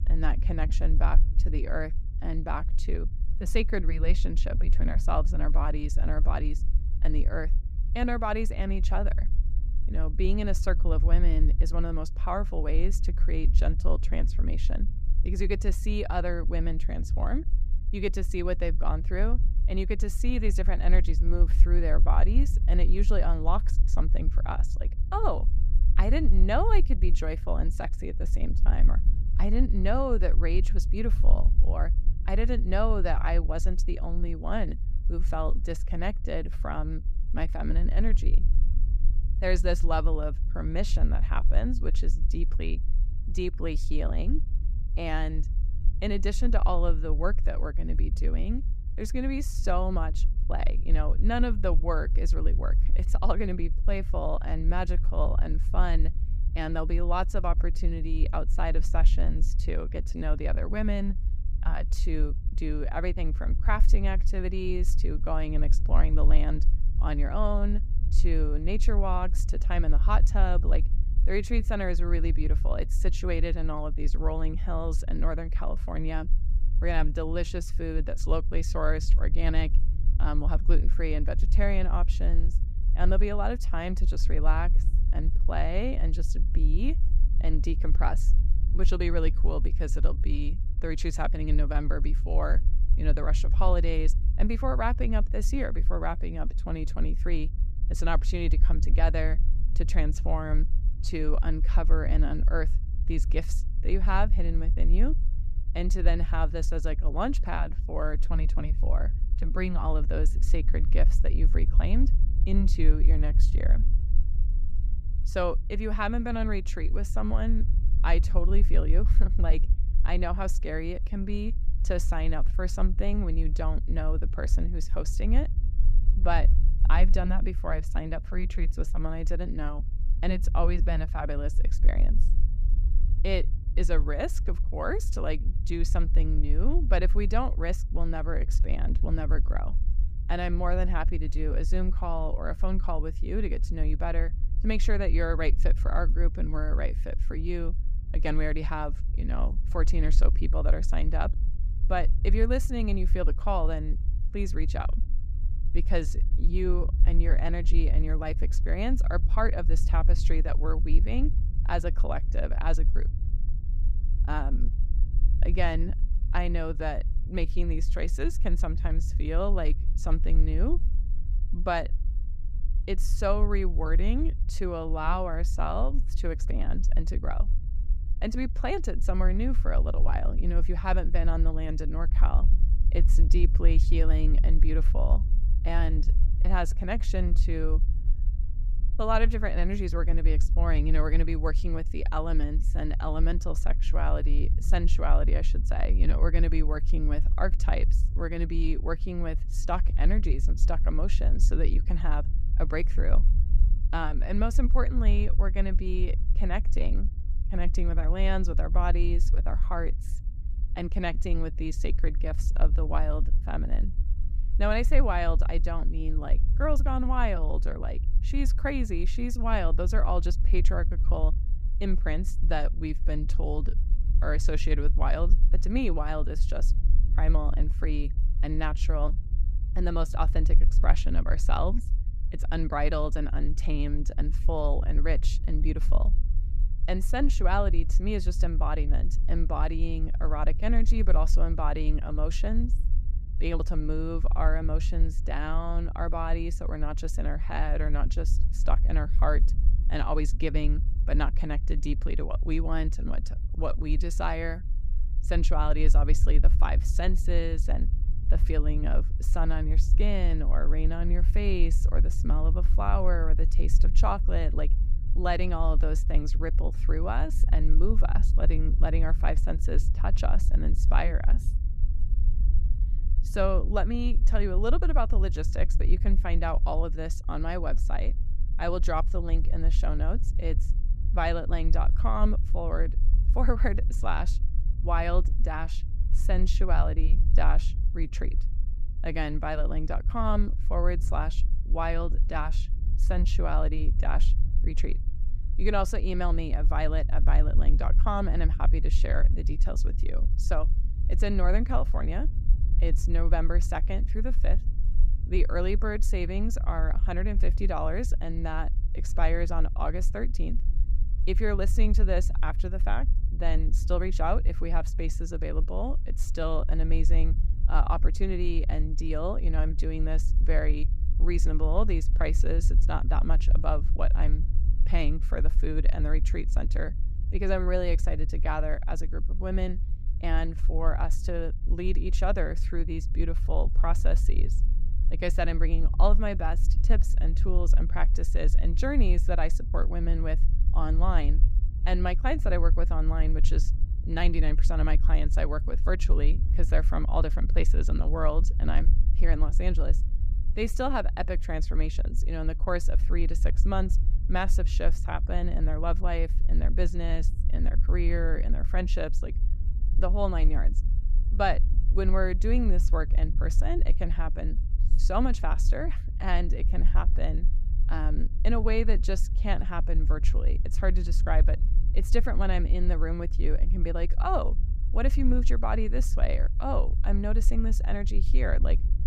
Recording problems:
low rumble; noticeable; throughout; 15 dB below the speech

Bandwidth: 15.5 kHz